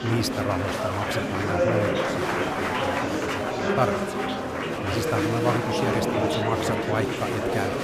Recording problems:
murmuring crowd; very loud; throughout; 4 dB above the speech

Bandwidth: 15 kHz